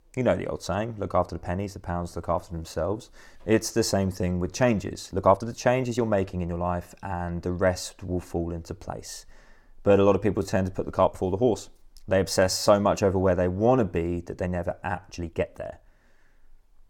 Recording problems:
uneven, jittery; strongly; from 2 to 16 s

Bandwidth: 17 kHz